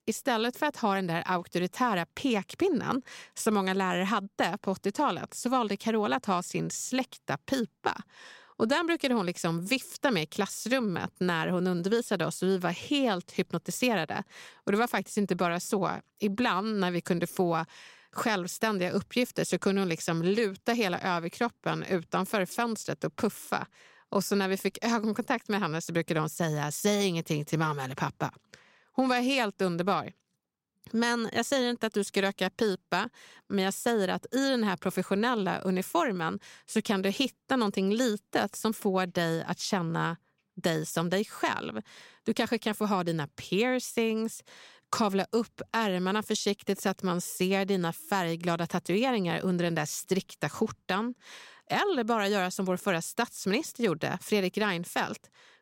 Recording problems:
none

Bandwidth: 16 kHz